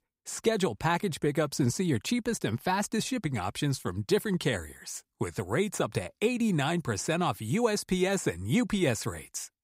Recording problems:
none

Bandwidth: 15.5 kHz